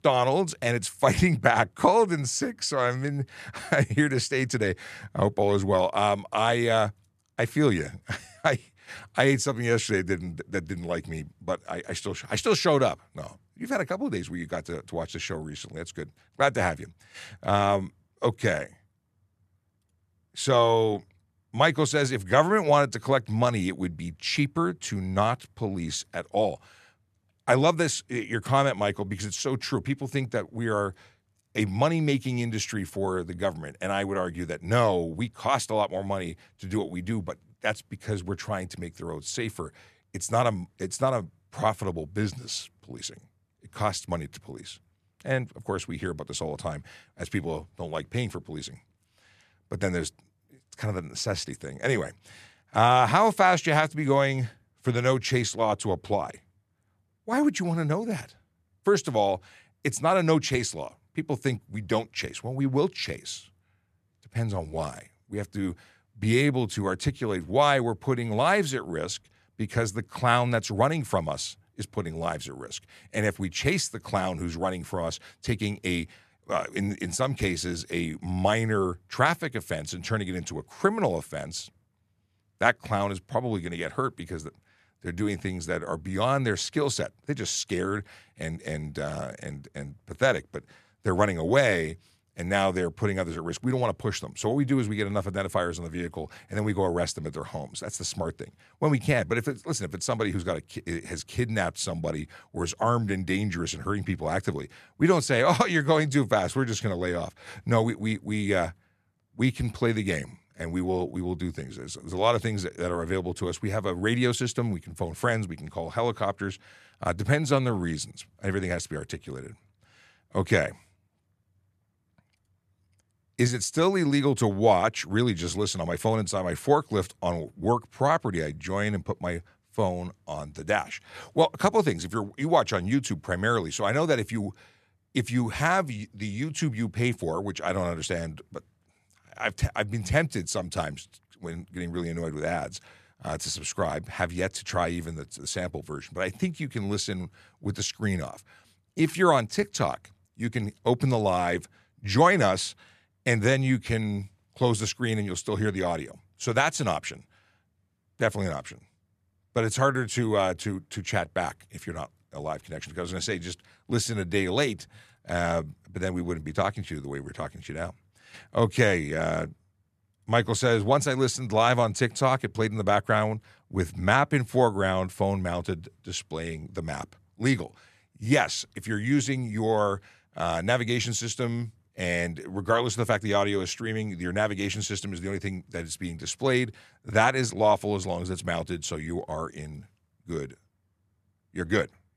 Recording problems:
none

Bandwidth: 14 kHz